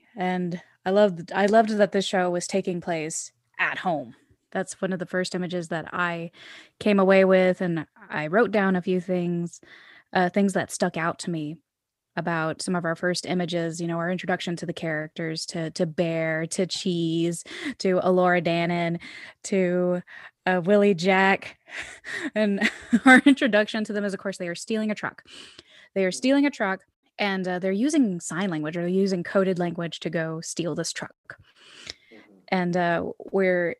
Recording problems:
none

